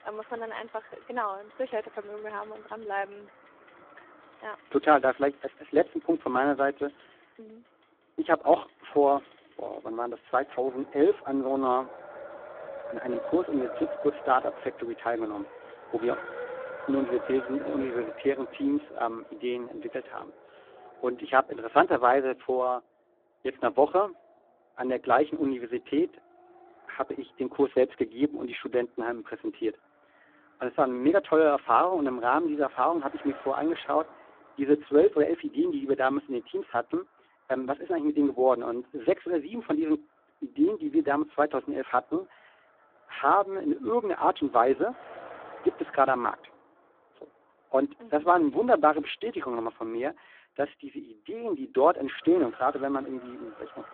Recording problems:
phone-call audio; poor line
traffic noise; noticeable; throughout; 15 dB below the speech

